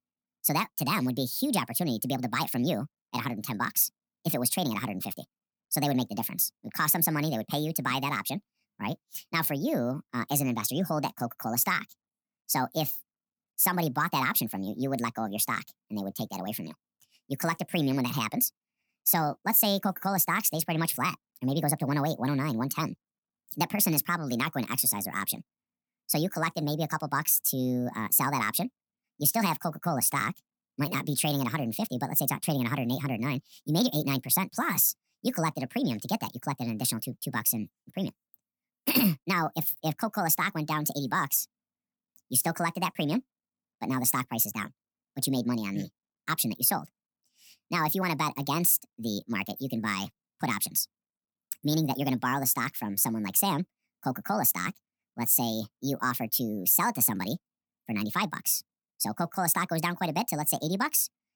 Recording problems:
wrong speed and pitch; too fast and too high; 1.6 times normal speed

